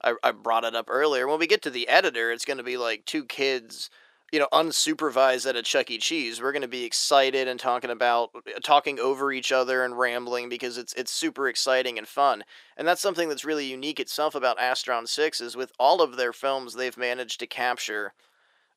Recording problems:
thin; somewhat; fading below 400 Hz

